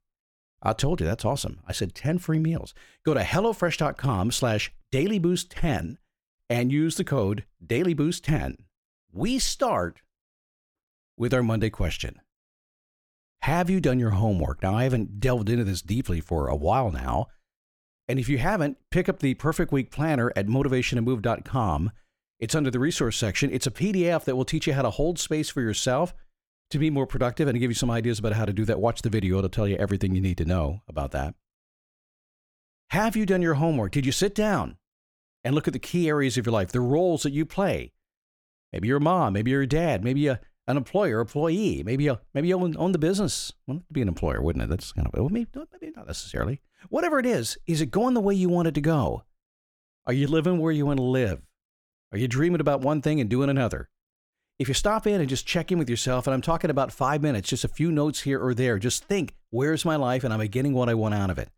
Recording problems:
none

